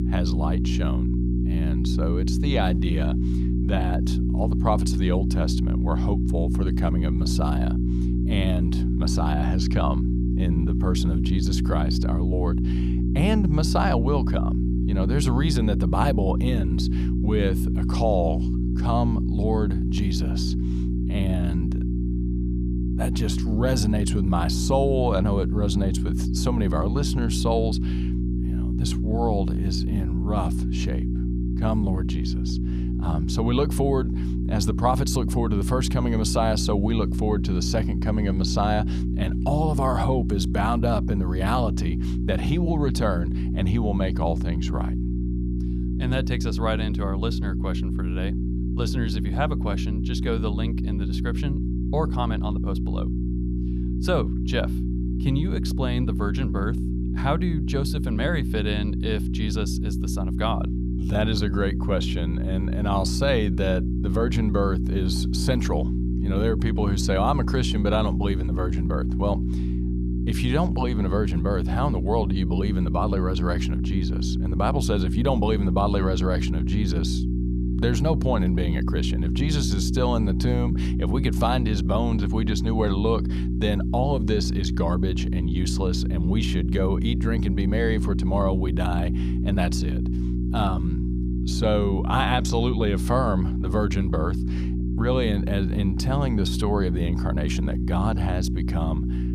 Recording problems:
electrical hum; loud; throughout; 60 Hz, 6 dB below the speech

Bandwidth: 15 kHz